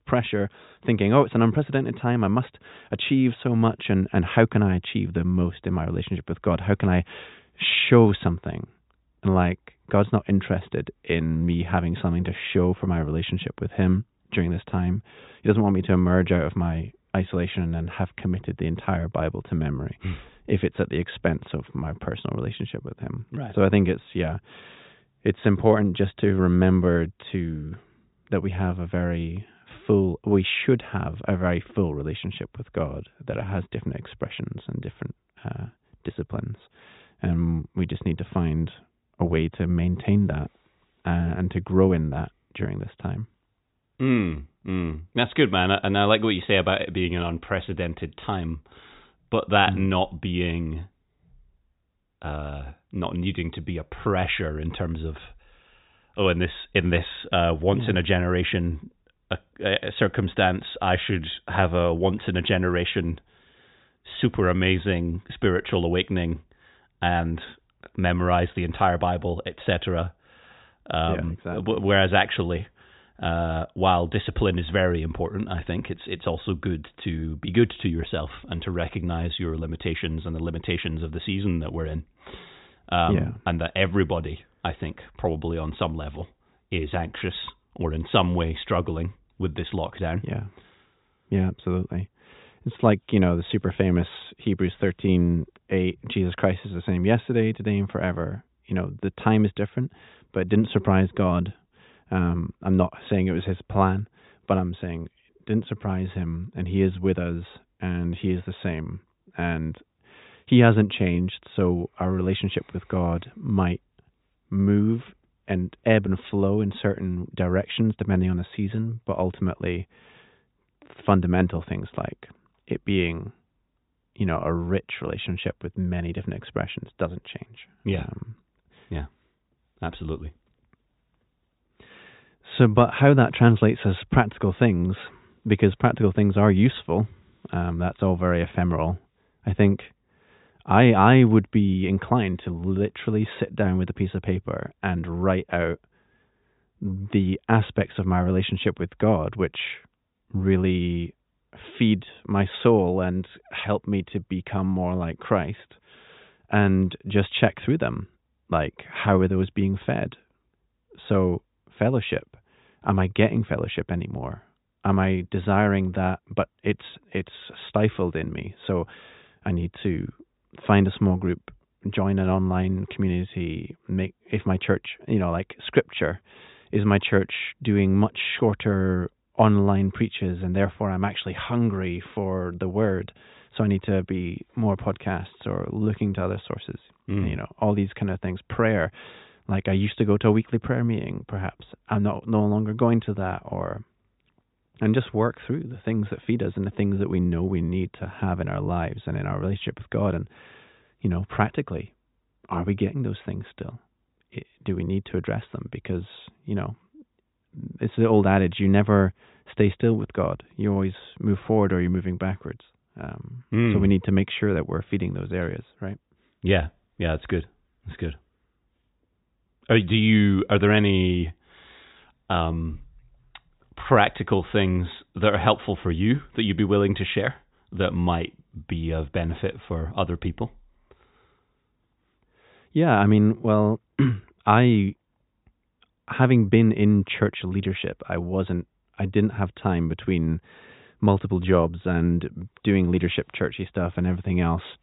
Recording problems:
high frequencies cut off; severe; nothing above 4 kHz

